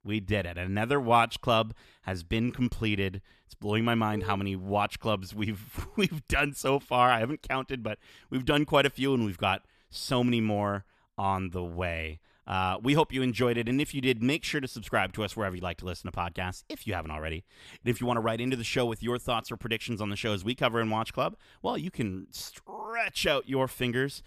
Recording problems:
none

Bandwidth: 14.5 kHz